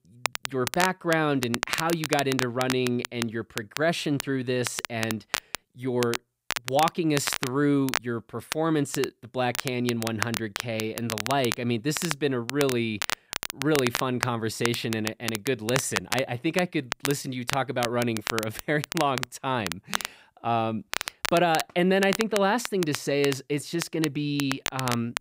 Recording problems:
crackle, like an old record; loud; 6 dB below the speech

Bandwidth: 15.5 kHz